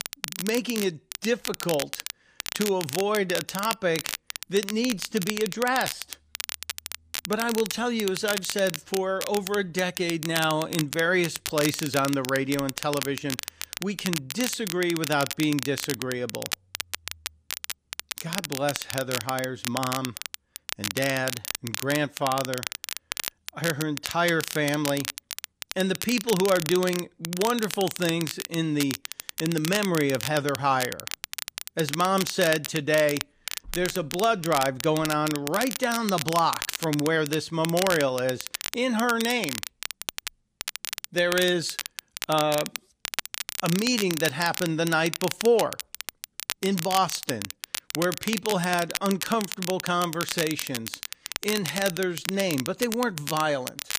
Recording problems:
crackle, like an old record; loud; 6 dB below the speech

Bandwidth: 15 kHz